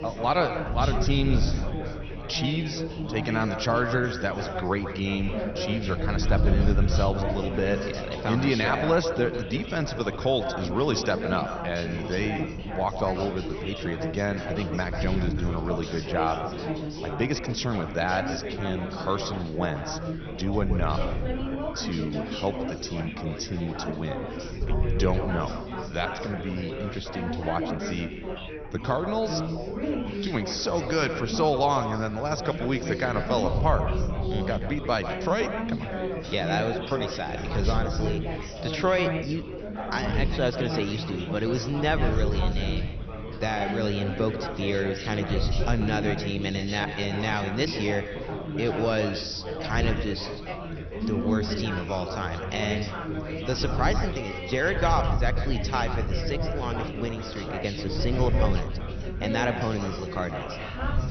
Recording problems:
echo of what is said; strong; throughout; 140 ms later, 10 dB below the speech
garbled, watery; slightly; nothing above 6 kHz
chatter from many people; loud; throughout; 5 dB below the speech
wind noise on the microphone; occasional gusts; 20 dB below the speech
rain or running water; faint; throughout; 20 dB below the speech

